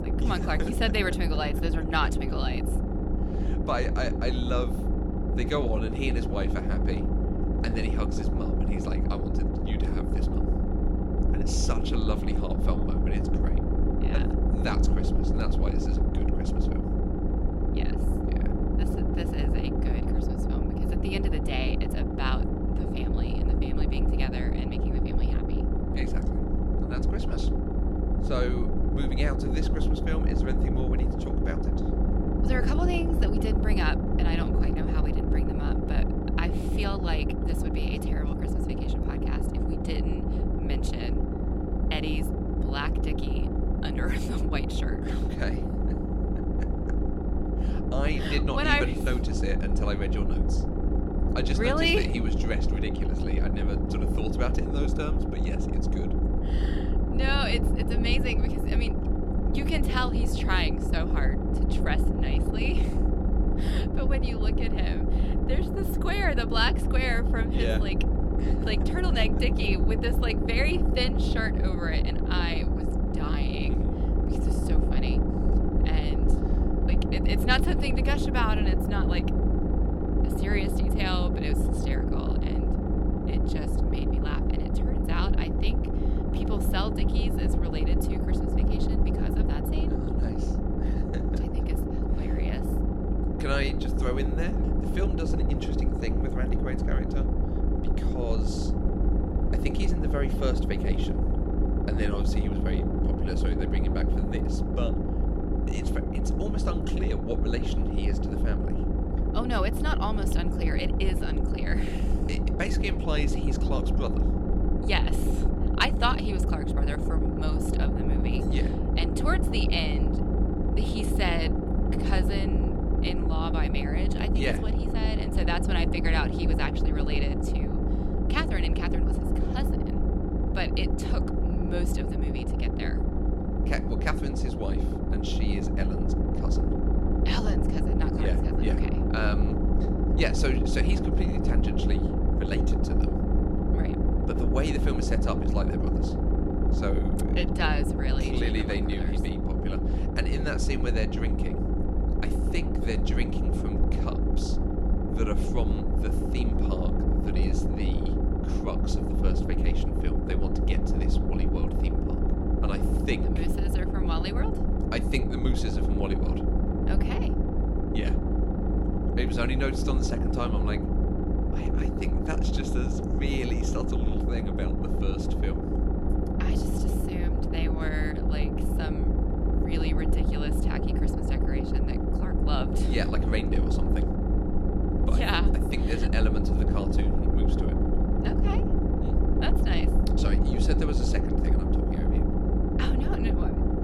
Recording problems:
low rumble; loud; throughout; 2 dB below the speech

